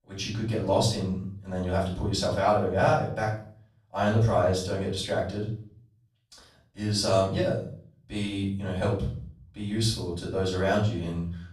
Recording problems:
off-mic speech; far
room echo; noticeable; dies away in 0.5 s

